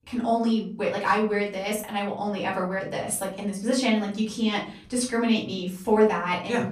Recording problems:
off-mic speech; far
room echo; slight; dies away in 0.4 s

